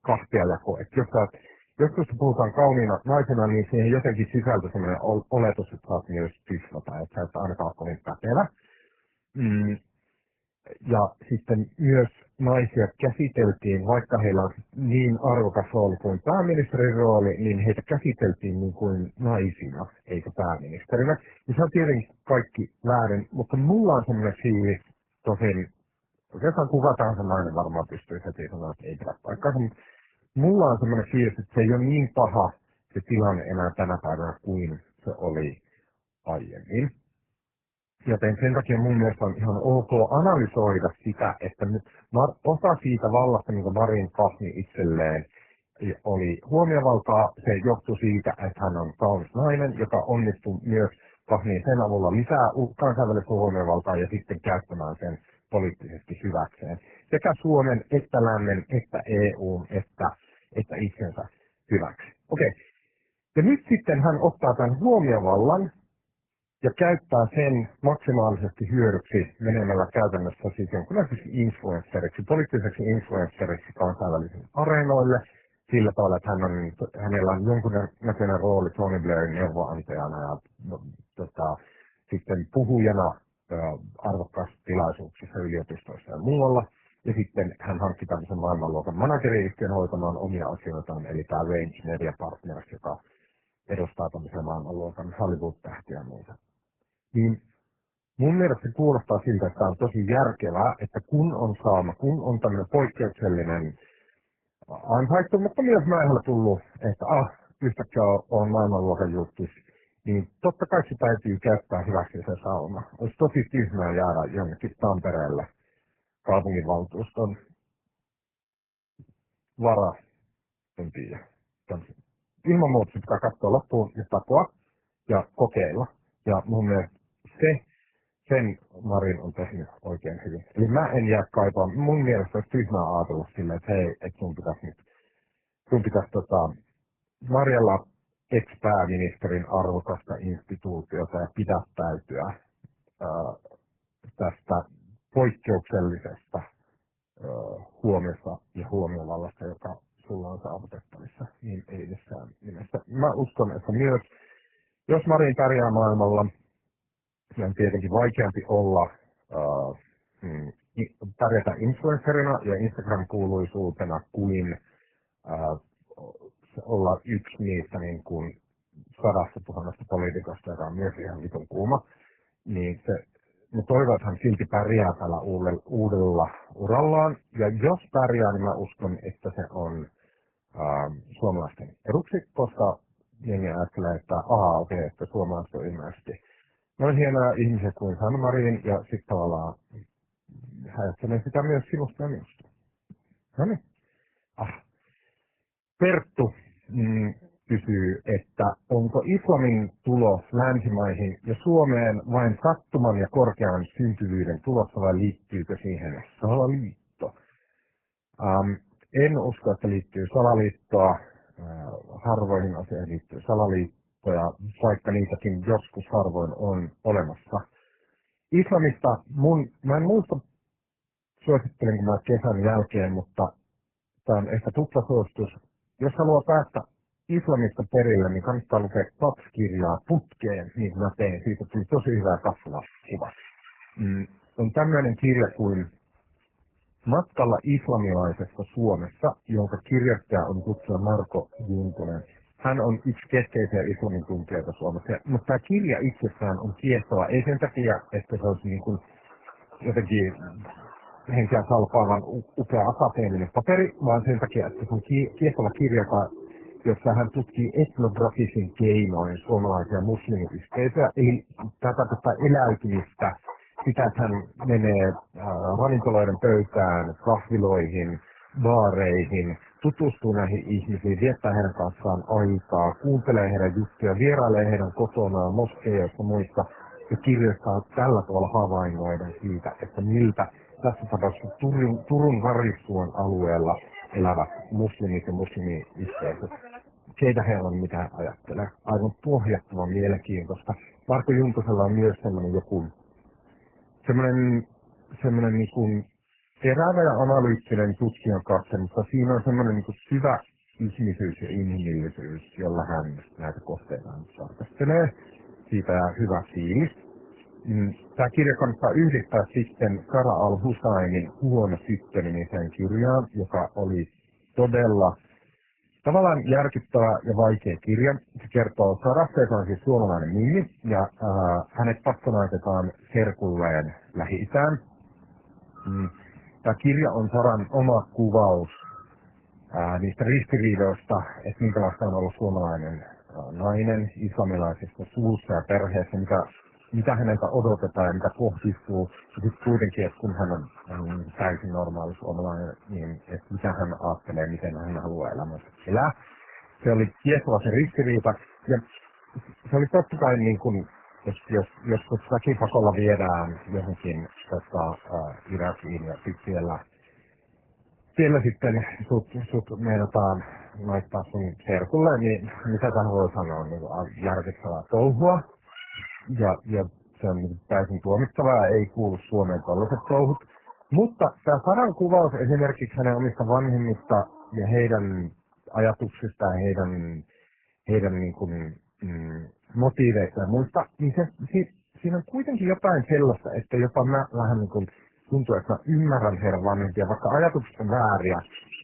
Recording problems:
garbled, watery; badly
animal sounds; faint; from 3:52 on; 25 dB below the speech

